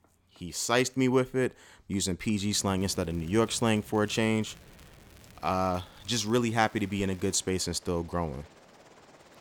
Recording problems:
train or aircraft noise; faint; from 2.5 s on; 25 dB below the speech
crackling; faint; from 3 to 7.5 s; 30 dB below the speech

